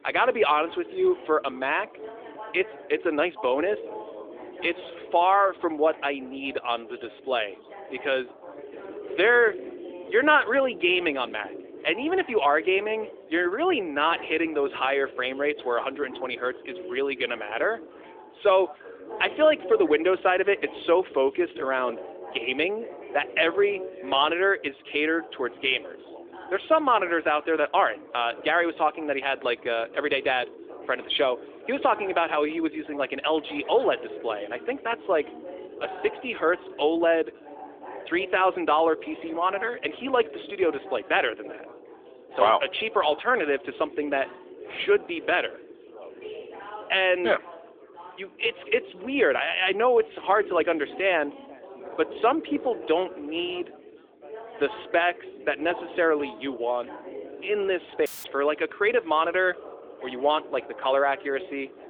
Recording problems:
phone-call audio; nothing above 3.5 kHz
chatter from many people; noticeable; throughout; 15 dB below the speech
audio cutting out; filled with static; at 58 s

